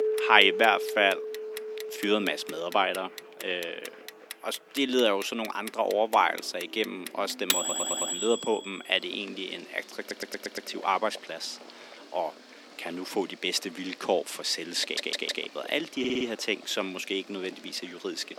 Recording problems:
thin; somewhat; fading below 250 Hz
household noises; loud; throughout; 9 dB below the speech
background music; loud; throughout; 9 dB below the speech
murmuring crowd; faint; throughout; 25 dB below the speech
audio stuttering; 4 times, first at 7.5 s

